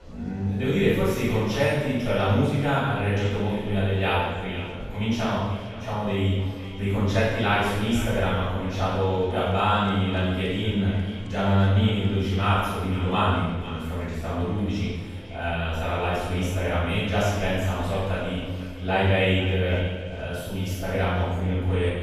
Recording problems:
room echo; strong; dies away in 1.1 s
off-mic speech; far
echo of what is said; noticeable; throughout; 490 ms later, 15 dB below the speech
murmuring crowd; faint; throughout; 25 dB below the speech

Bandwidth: 15 kHz